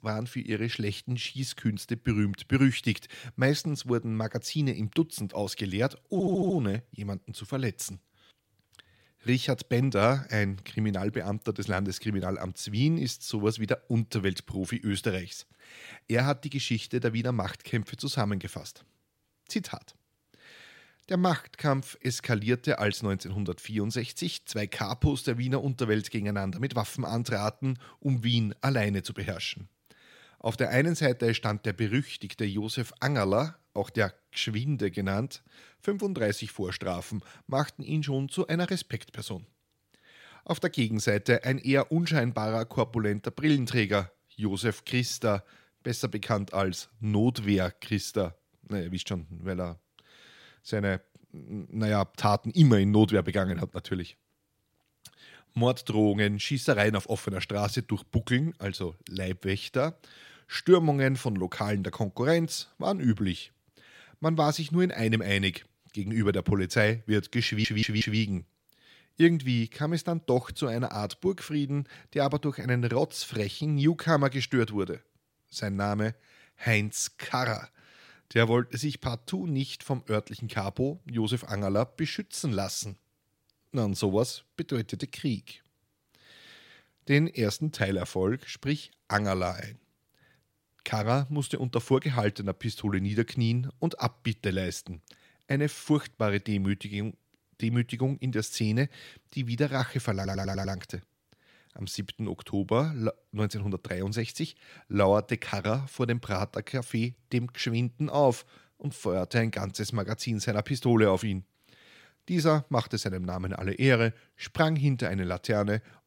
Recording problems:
audio stuttering; at 6 s, at 1:07 and at 1:40

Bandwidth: 16 kHz